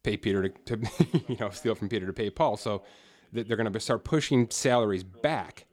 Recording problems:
voice in the background; faint; throughout; 30 dB below the speech

